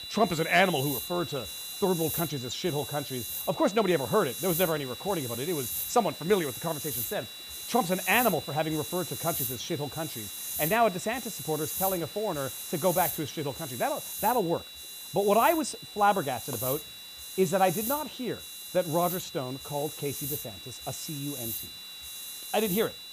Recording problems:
hiss; loud; throughout; 6 dB below the speech
high-pitched whine; noticeable; throughout; 4 kHz, 10 dB below the speech

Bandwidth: 15 kHz